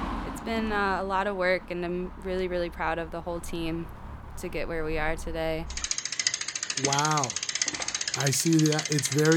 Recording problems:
traffic noise; loud; throughout; 1 dB below the speech
abrupt cut into speech; at the end

